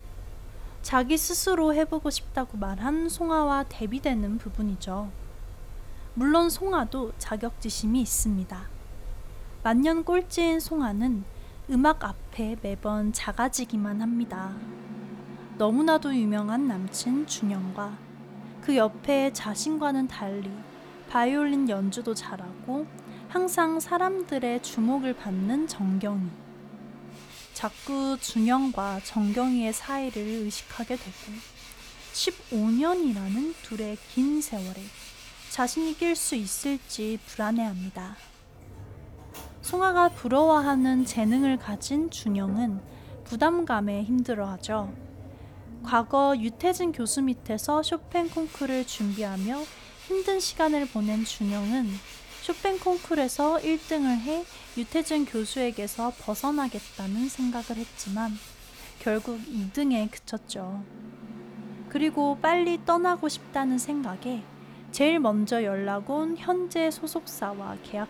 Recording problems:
machinery noise; noticeable; throughout; 15 dB below the speech

